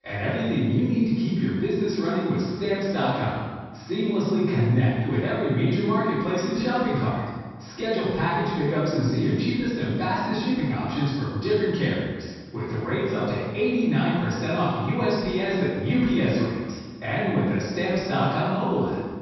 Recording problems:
room echo; strong; dies away in 1.4 s
off-mic speech; far
high frequencies cut off; noticeable; nothing above 5.5 kHz

